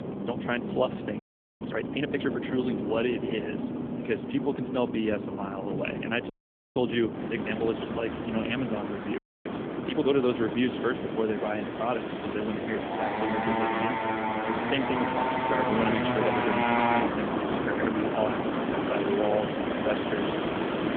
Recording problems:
phone-call audio; nothing above 3.5 kHz
traffic noise; very loud; throughout; as loud as the speech
wind noise on the microphone; occasional gusts; 10 dB below the speech
audio freezing; at 1 s, at 6.5 s and at 9 s

